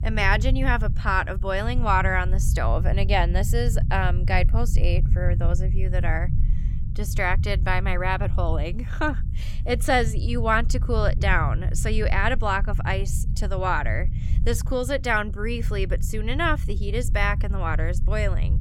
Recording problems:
low rumble; noticeable; throughout; 15 dB below the speech

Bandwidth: 17.5 kHz